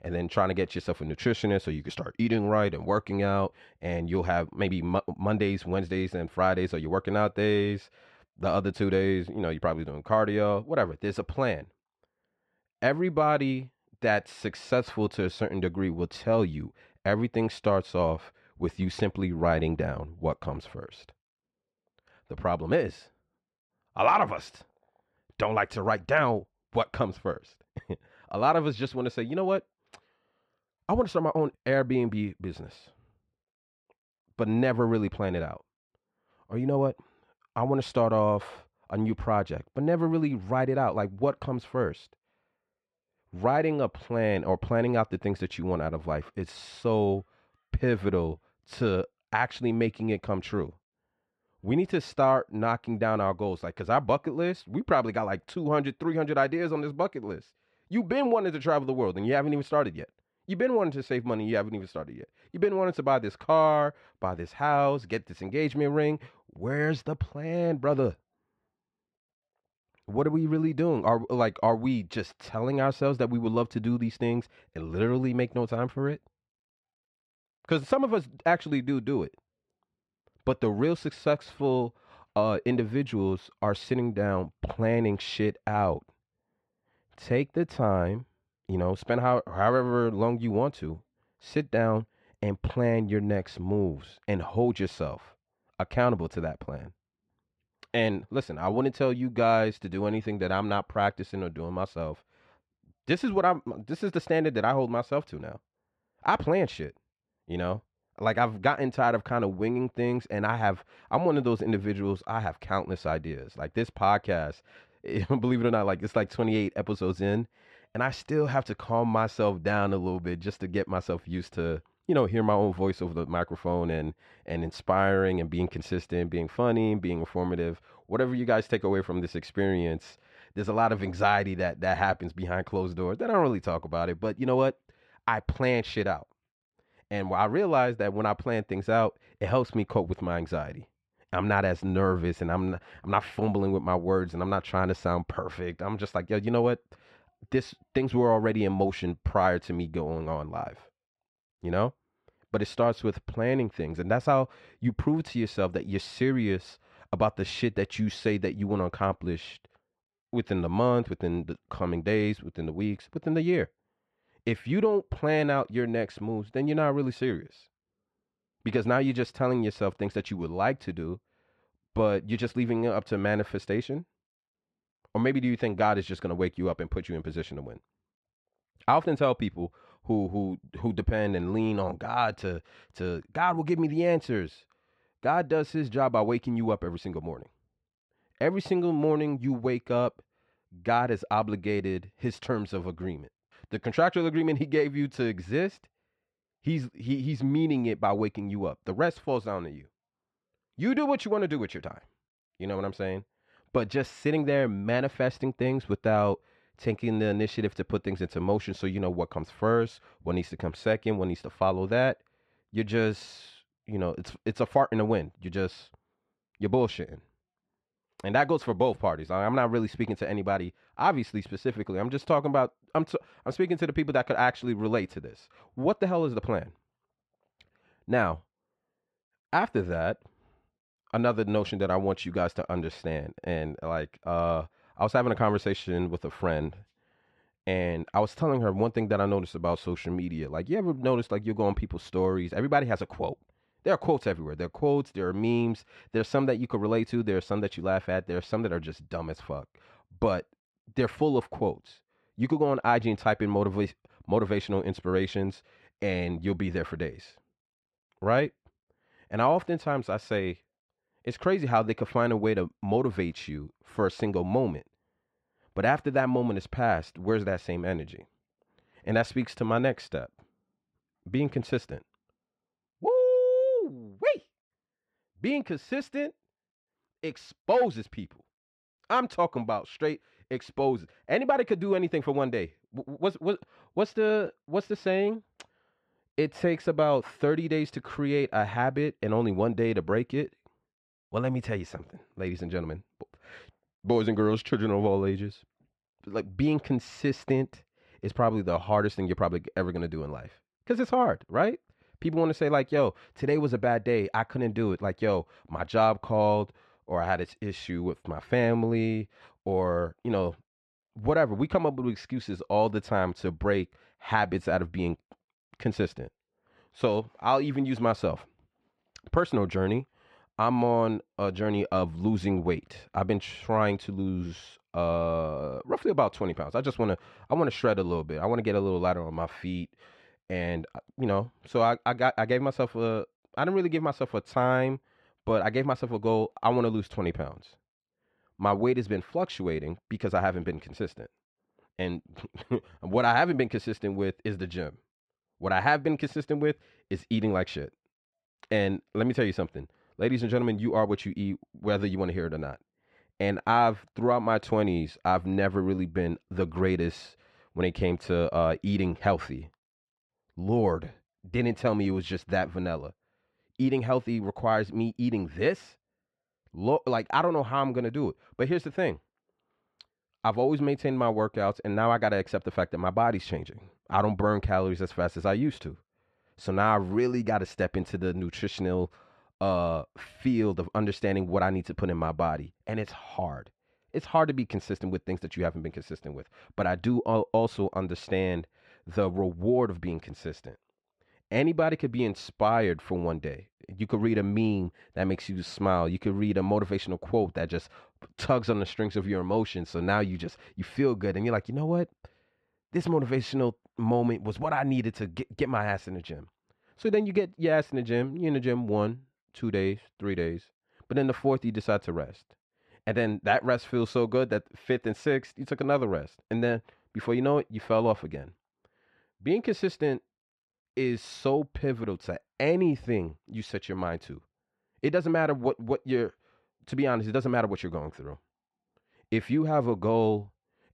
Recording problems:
muffled; slightly; fading above 3 kHz

